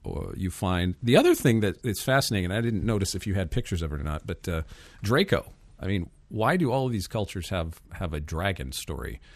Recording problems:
none

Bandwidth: 14.5 kHz